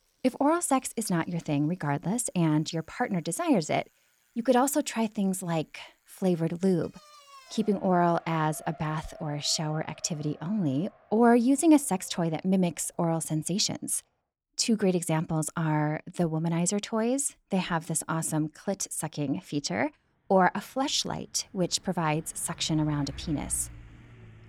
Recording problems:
traffic noise; faint; throughout; 25 dB below the speech

